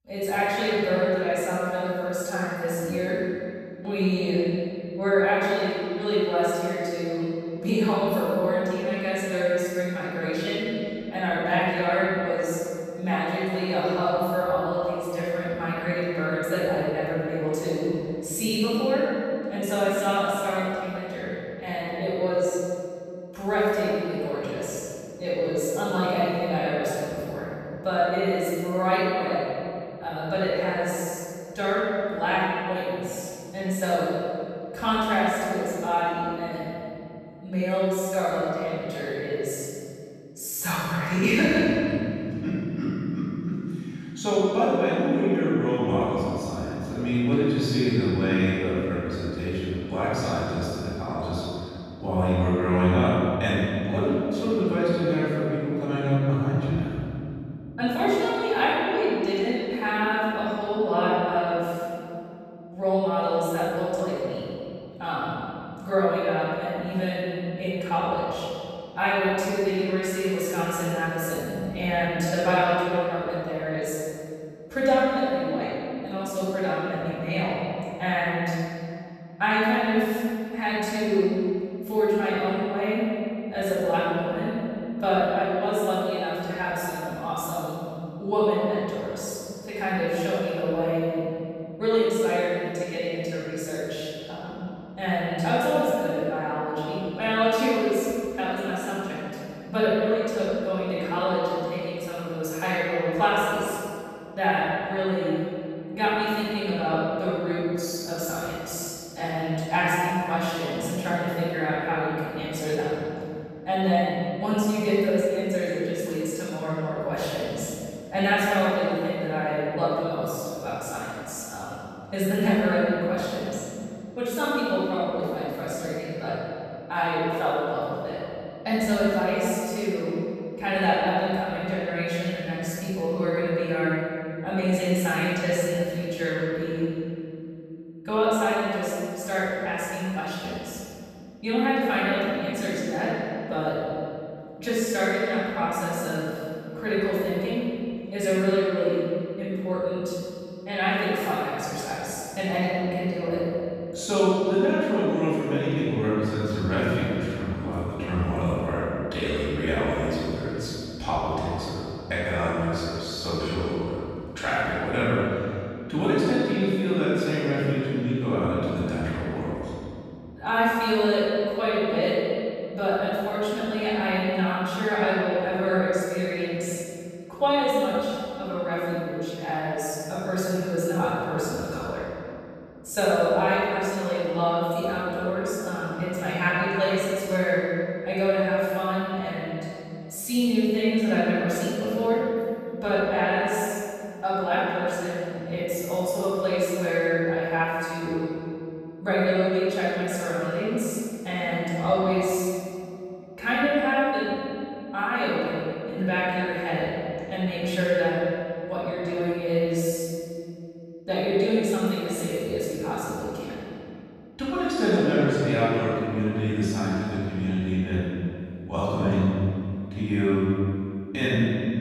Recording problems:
room echo; strong; dies away in 2.7 s
off-mic speech; far

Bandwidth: 14.5 kHz